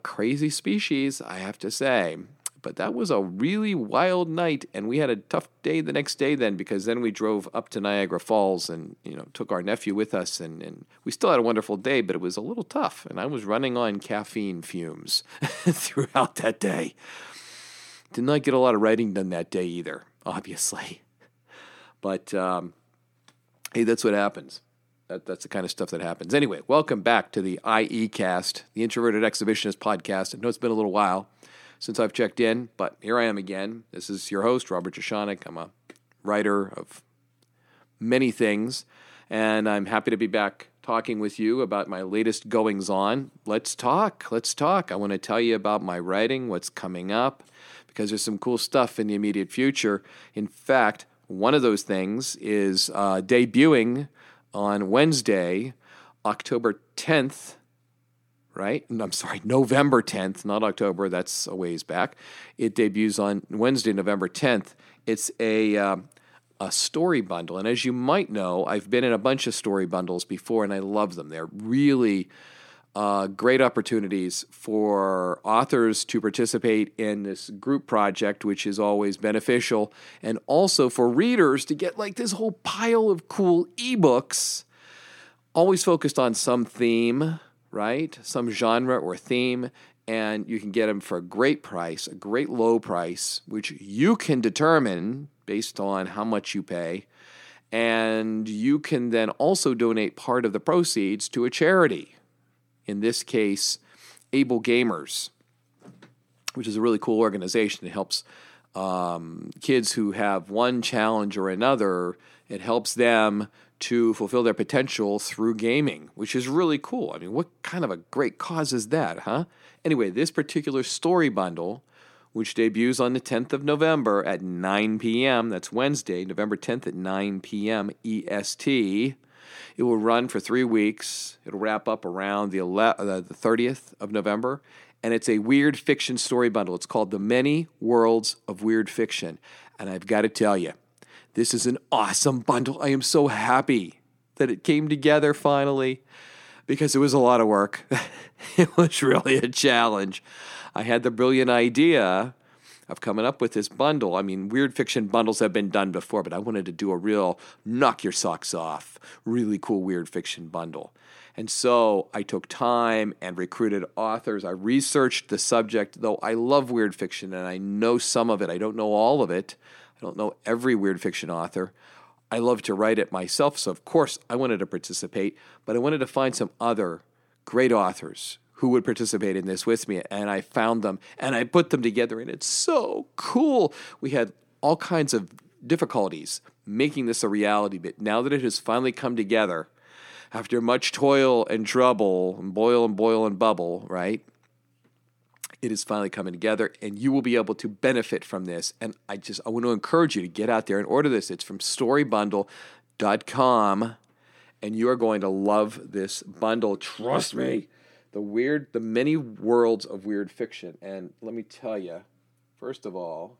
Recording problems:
none

